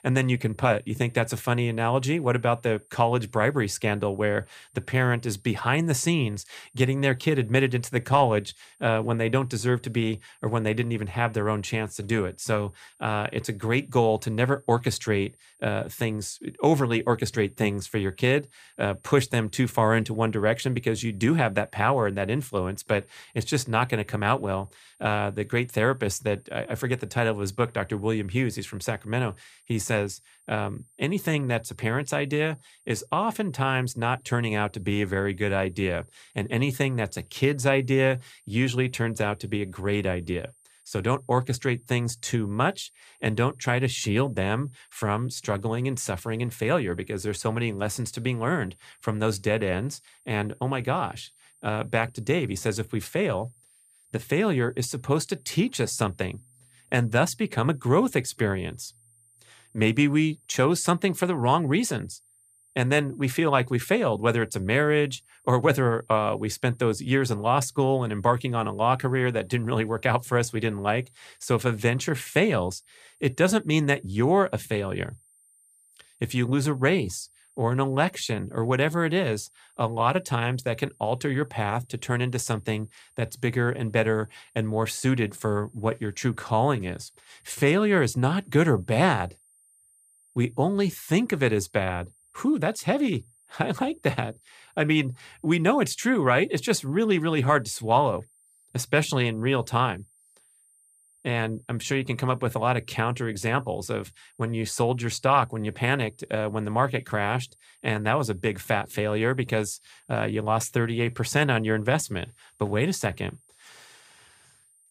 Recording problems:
high-pitched whine; faint; throughout; 9 kHz, 30 dB below the speech

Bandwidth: 15 kHz